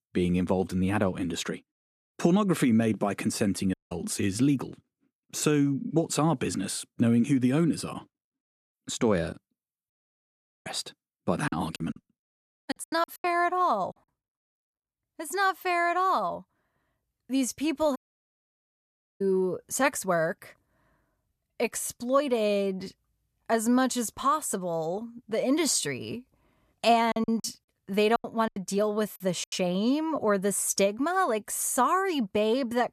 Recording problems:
audio cutting out; at 3.5 s, at 10 s for 1 s and at 18 s for 1 s
choppy; very; from 11 to 13 s and from 27 to 30 s; 16% of the speech affected

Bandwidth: 14 kHz